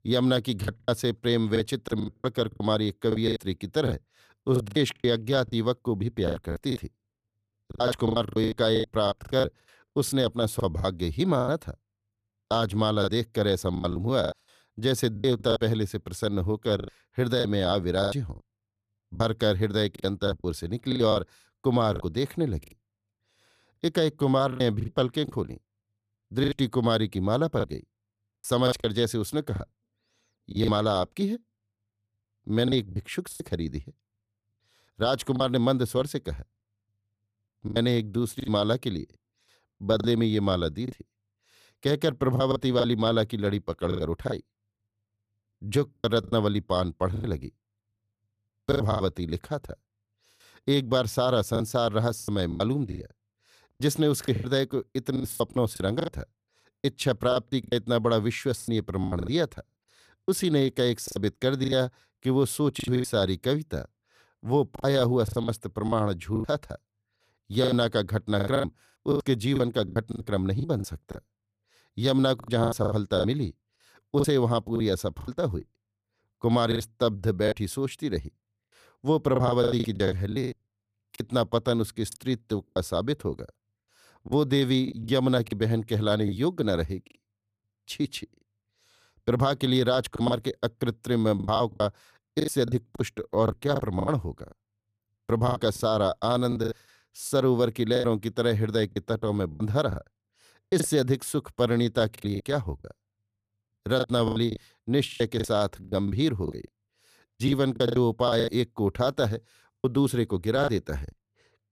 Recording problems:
choppy; very; 13% of the speech affected

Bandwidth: 14.5 kHz